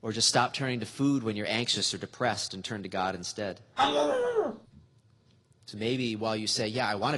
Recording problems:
garbled, watery; slightly; nothing above 10.5 kHz
dog barking; loud; at 4 s; peak 4 dB above the speech
abrupt cut into speech; at the end

